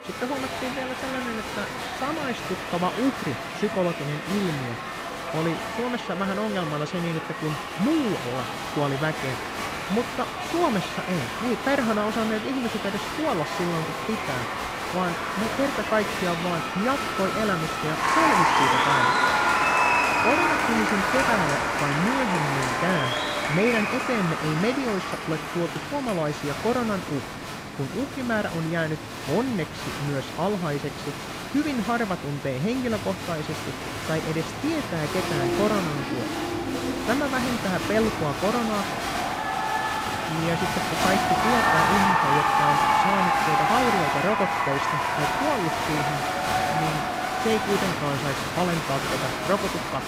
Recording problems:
crowd noise; very loud; throughout; 2 dB above the speech

